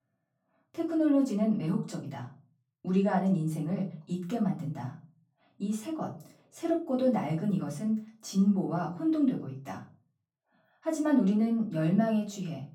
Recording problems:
off-mic speech; far
room echo; slight; dies away in 0.3 s

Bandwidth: 17.5 kHz